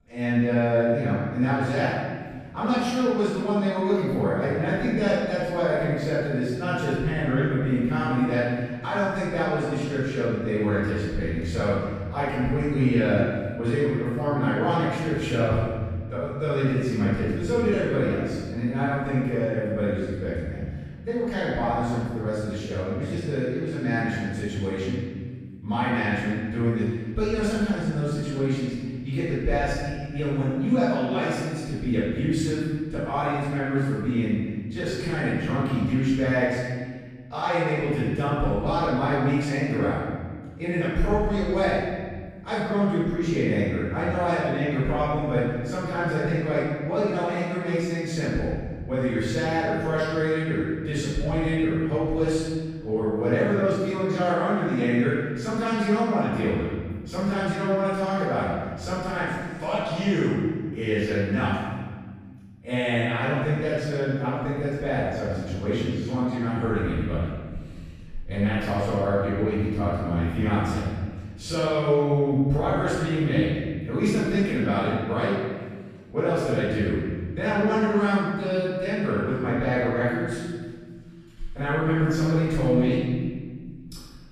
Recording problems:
room echo; strong; dies away in 1.7 s
off-mic speech; far

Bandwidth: 14.5 kHz